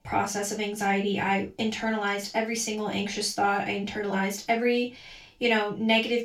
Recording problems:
off-mic speech; far
room echo; slight; dies away in 0.2 s

